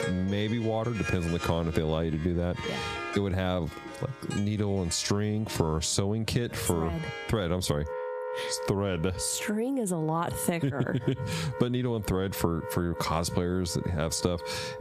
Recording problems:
squashed, flat; heavily, background pumping
background music; noticeable; throughout; 10 dB below the speech

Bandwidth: 14.5 kHz